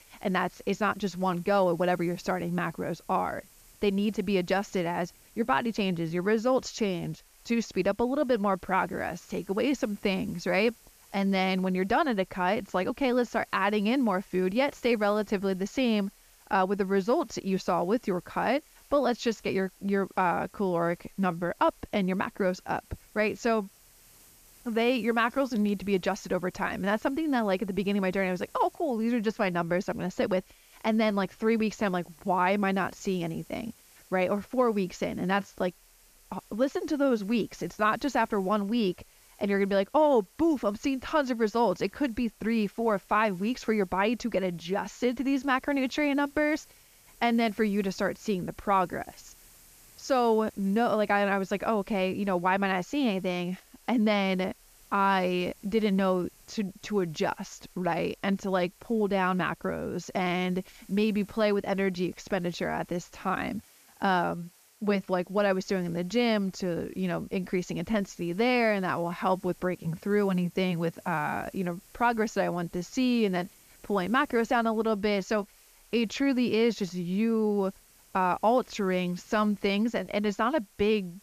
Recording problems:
high frequencies cut off; noticeable; nothing above 7.5 kHz
hiss; faint; throughout; 25 dB below the speech

